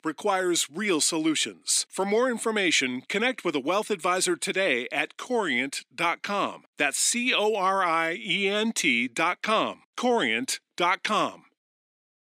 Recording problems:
thin; somewhat; fading below 250 Hz

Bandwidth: 15.5 kHz